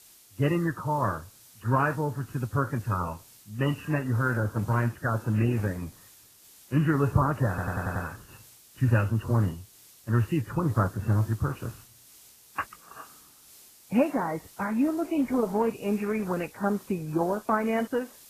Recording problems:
garbled, watery; badly
muffled; very; fading above 2 kHz
hiss; faint; throughout; 25 dB below the speech
audio stuttering; at 7.5 s

